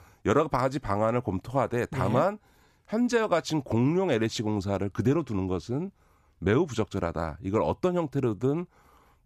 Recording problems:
none

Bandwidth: 14.5 kHz